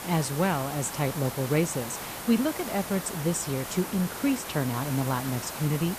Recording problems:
hiss; loud; throughout; 7 dB below the speech

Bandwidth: 14.5 kHz